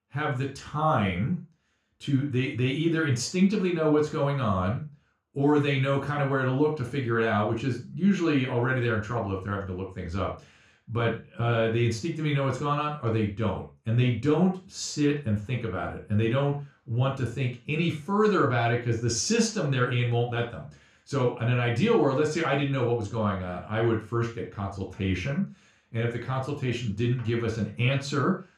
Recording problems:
off-mic speech; far
room echo; slight; dies away in 0.3 s

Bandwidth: 14.5 kHz